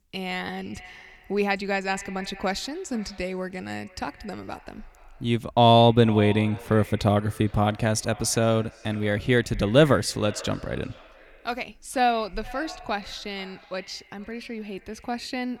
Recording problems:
echo of what is said; faint; throughout; 460 ms later, 20 dB below the speech

